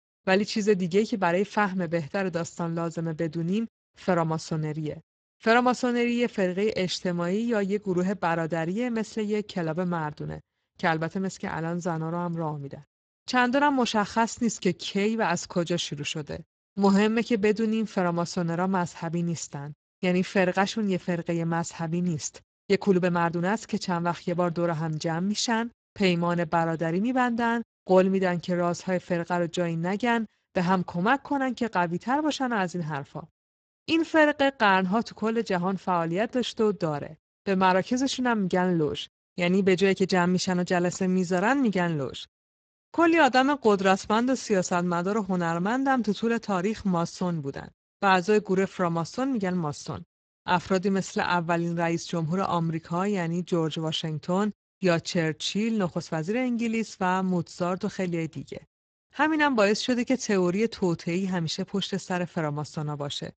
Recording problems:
garbled, watery; badly; nothing above 7.5 kHz
uneven, jittery; strongly; from 17 to 59 s

